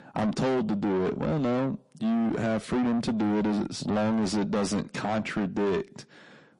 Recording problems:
distortion; heavy; 6 dB below the speech
garbled, watery; slightly; nothing above 10.5 kHz

